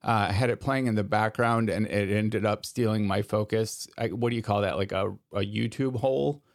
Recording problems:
none

